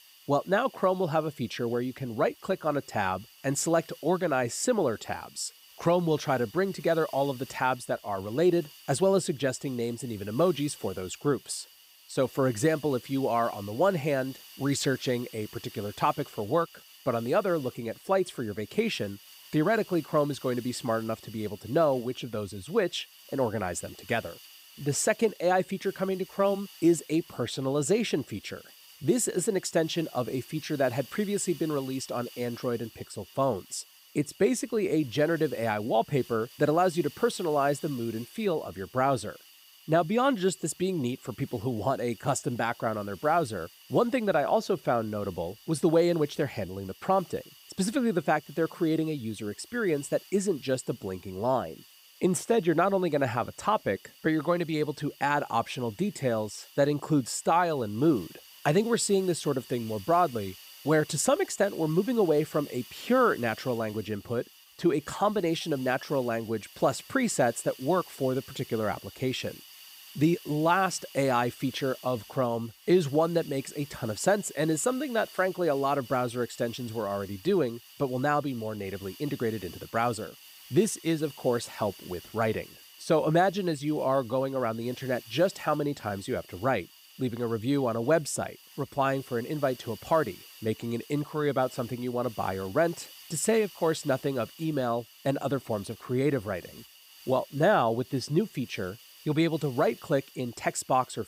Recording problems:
hiss; faint; throughout; 20 dB below the speech

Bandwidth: 15.5 kHz